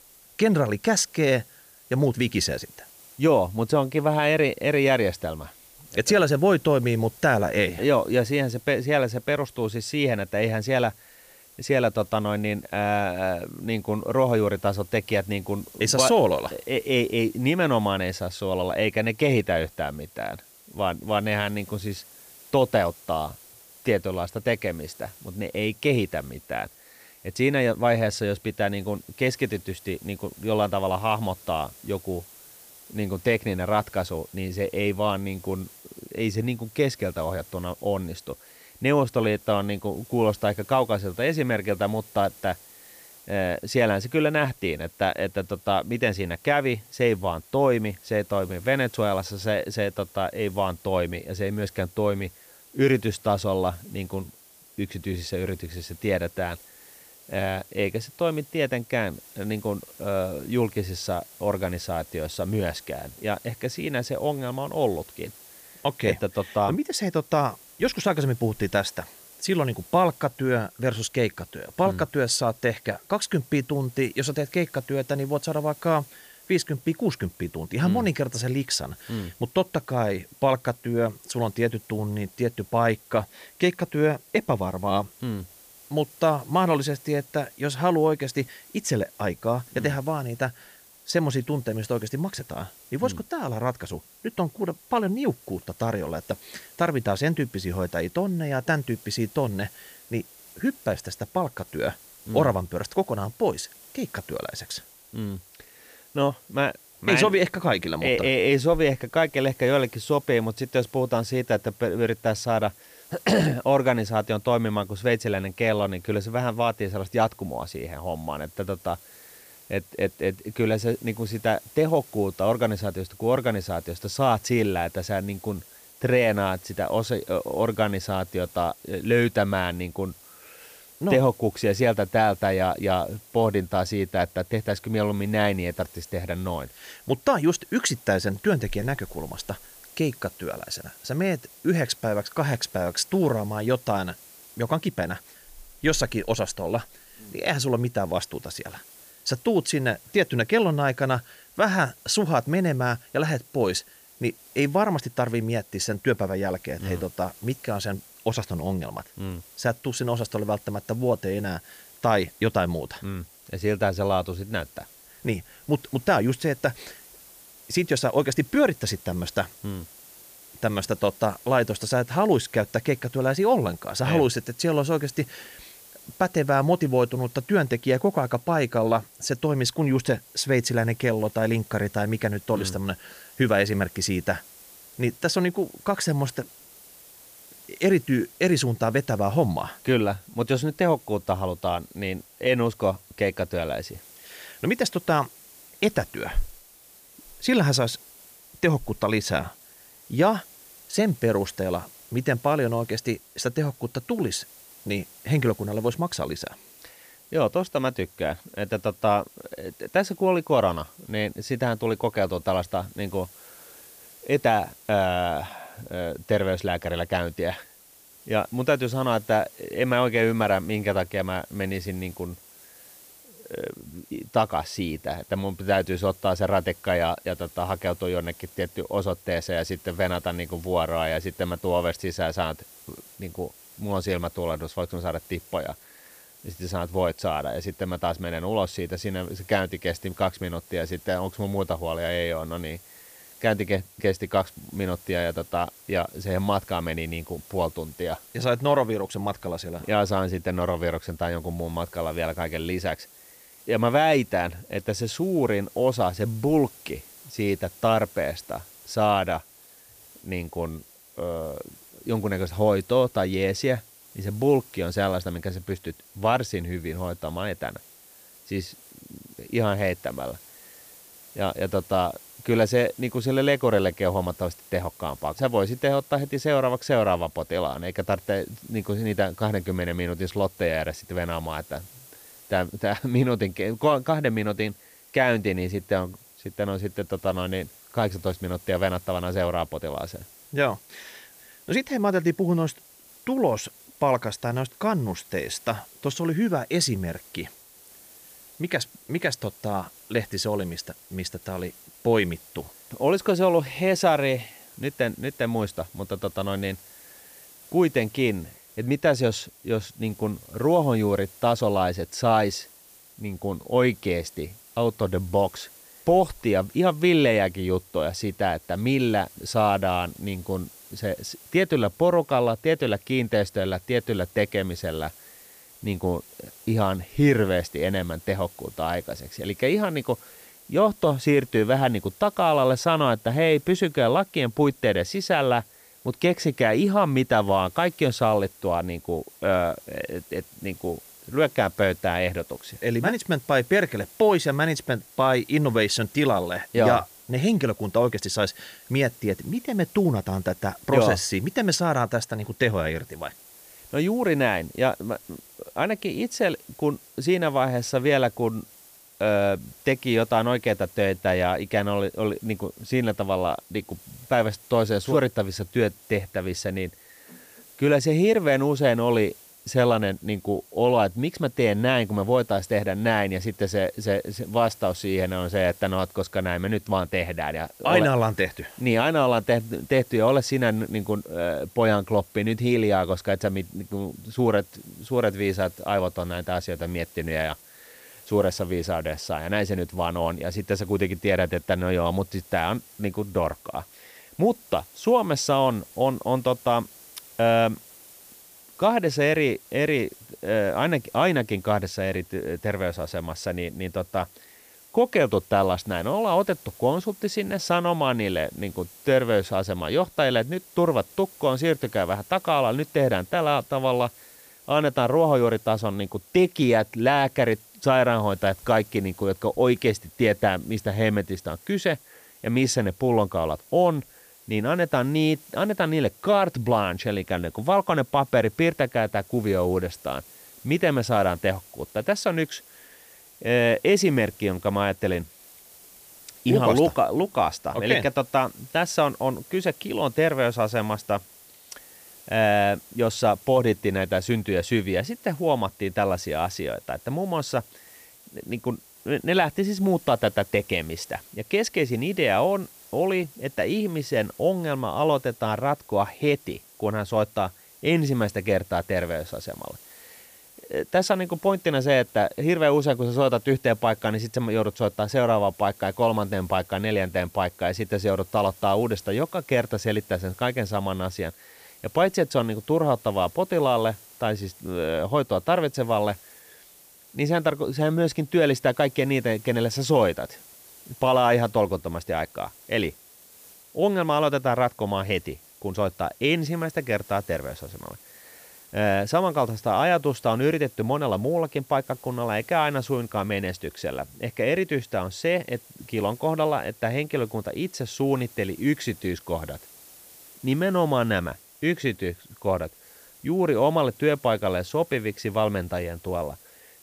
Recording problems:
hiss; faint; throughout; 20 dB below the speech

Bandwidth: 15 kHz